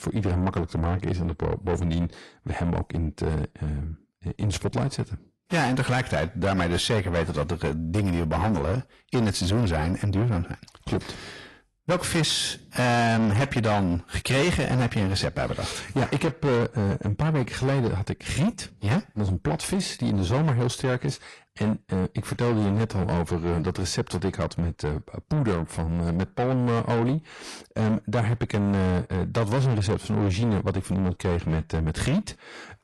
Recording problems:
distortion; heavy; 7 dB below the speech
garbled, watery; slightly; nothing above 11.5 kHz

